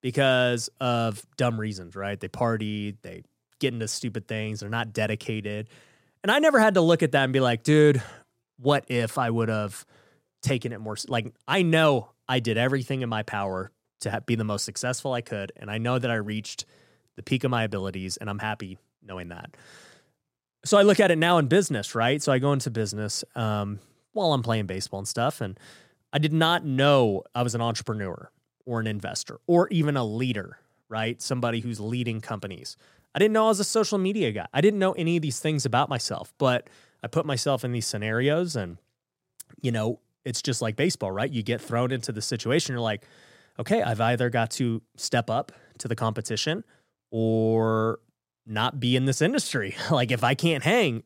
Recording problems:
none

